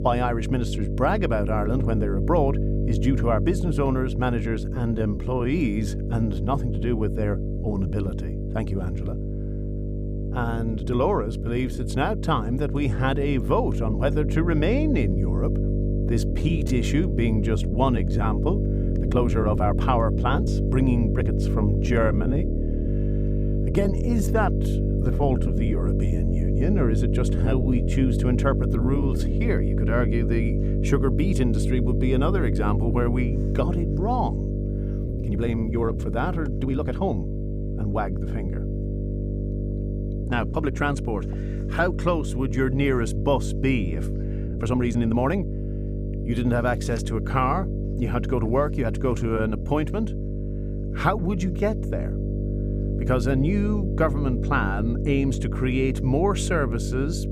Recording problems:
electrical hum; loud; throughout; 50 Hz, 7 dB below the speech
uneven, jittery; strongly; from 4.5 to 50 s

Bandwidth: 15.5 kHz